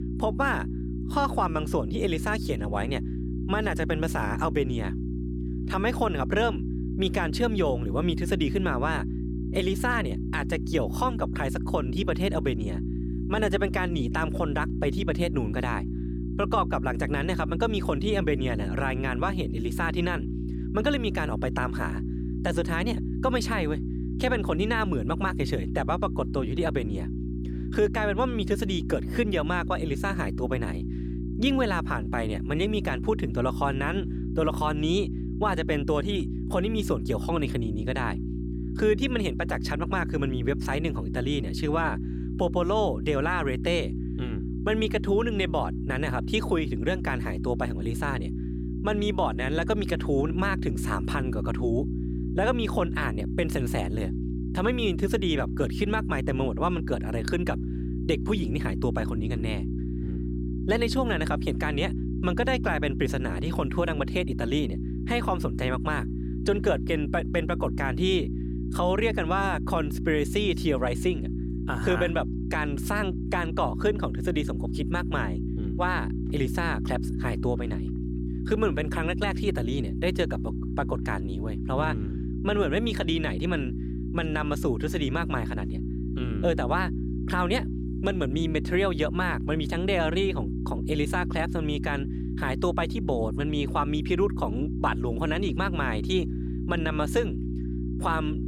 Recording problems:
electrical hum; loud; throughout; 60 Hz, 10 dB below the speech

